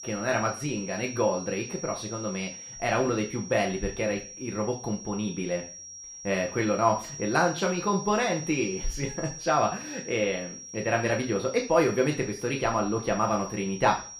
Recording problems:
room echo; slight; dies away in 0.4 s
off-mic speech; somewhat distant
high-pitched whine; noticeable; throughout; 5.5 kHz, 10 dB below the speech

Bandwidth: 14.5 kHz